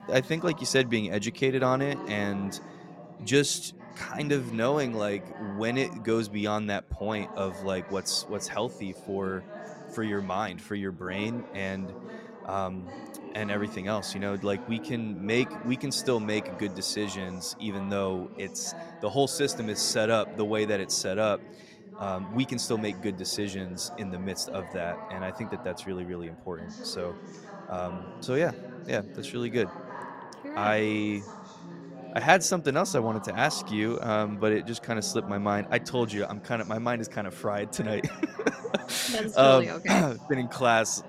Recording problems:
background chatter; noticeable; throughout; 4 voices, 15 dB below the speech

